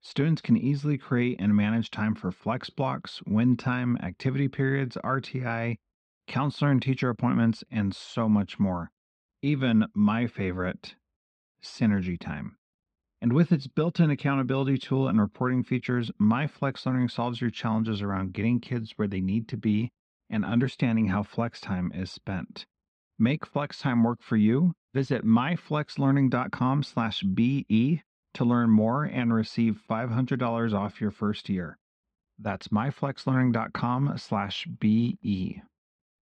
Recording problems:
muffled; slightly; fading above 3 kHz

